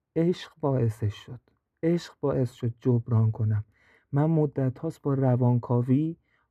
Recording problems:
muffled; very; fading above 2.5 kHz

